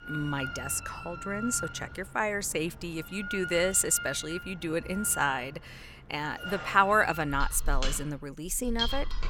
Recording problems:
machinery noise; loud; throughout; 8 dB below the speech

